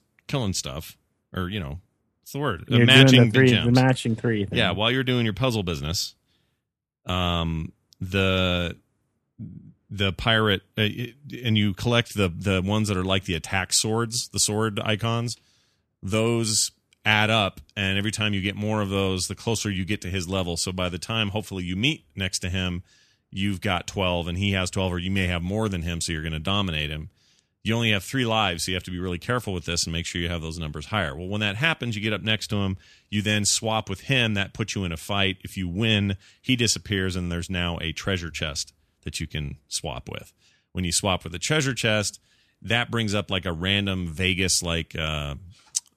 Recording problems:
none

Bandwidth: 14 kHz